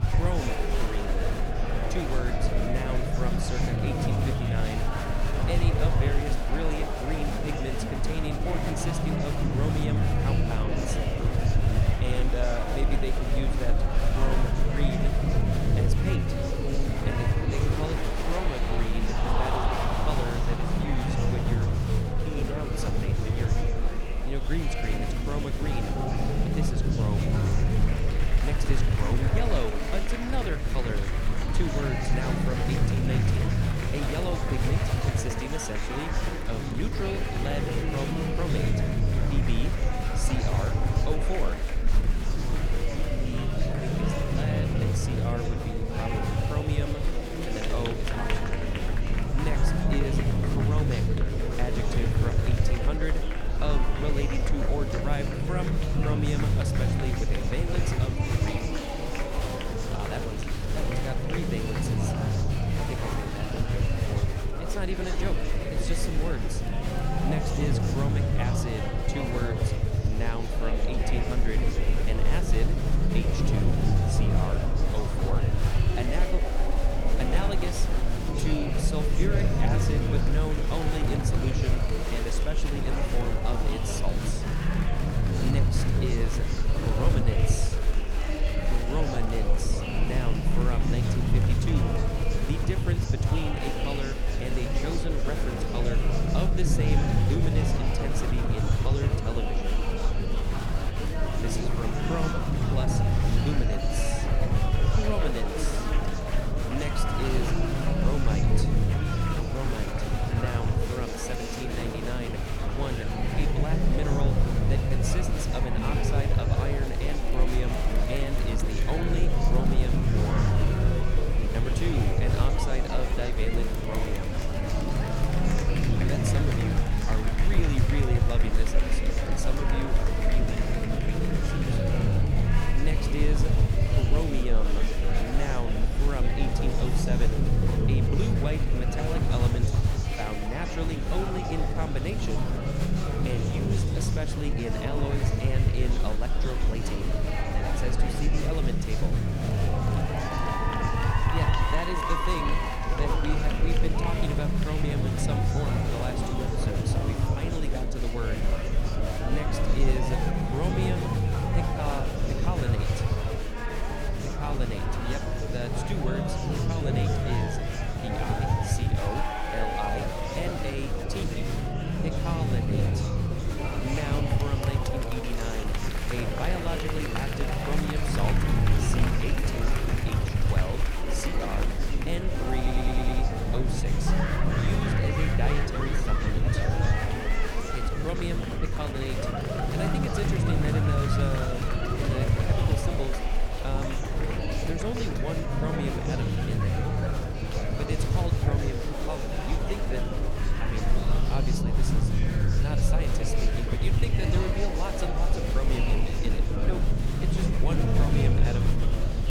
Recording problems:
murmuring crowd; very loud; throughout; 2 dB above the speech
low rumble; loud; throughout; 4 dB below the speech
audio stuttering; at 3:03

